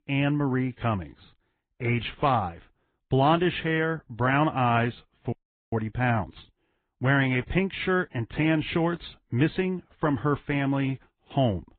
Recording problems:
high frequencies cut off; severe; nothing above 3.5 kHz
garbled, watery; slightly
audio cutting out; at 5.5 s

